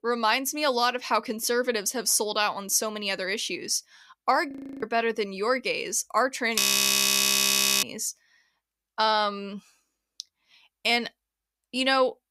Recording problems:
audio freezing; at 4.5 s and at 6.5 s for 1 s
clattering dishes; loud; at 6.5 s; peak 4 dB above the speech

